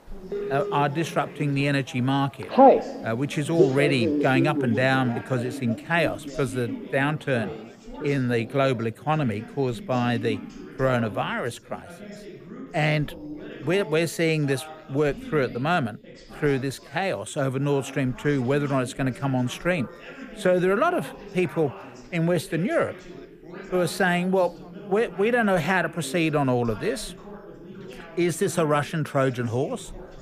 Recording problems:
alarms or sirens; loud; throughout; 2 dB below the speech
background chatter; noticeable; throughout; 3 voices, 15 dB below the speech

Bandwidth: 15 kHz